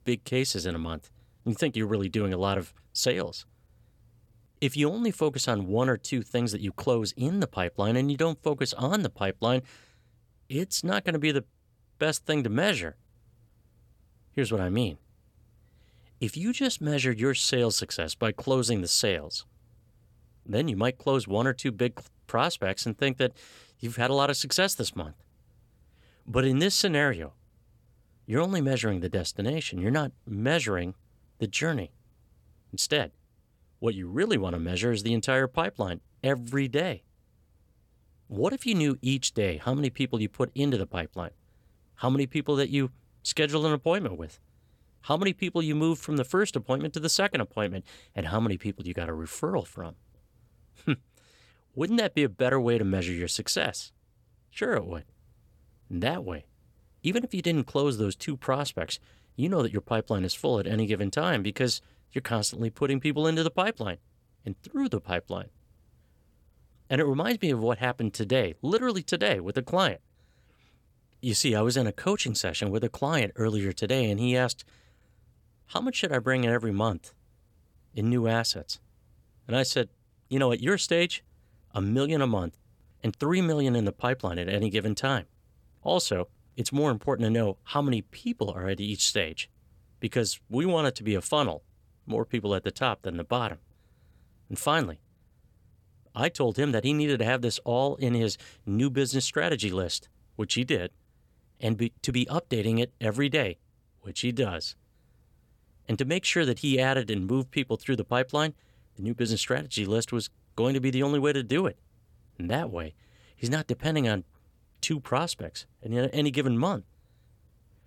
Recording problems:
none

